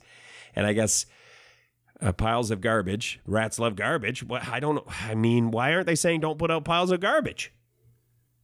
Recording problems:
none

